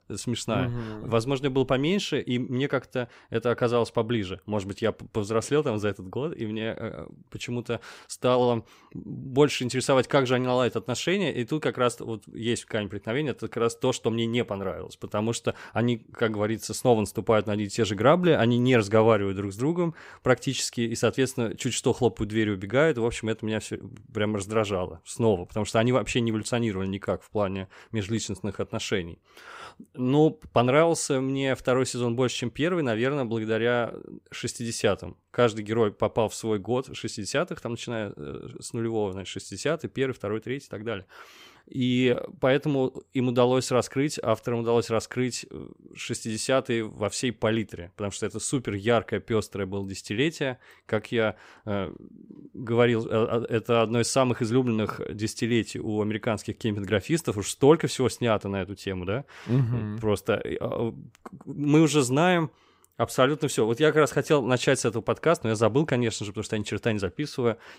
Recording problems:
none

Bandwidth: 15.5 kHz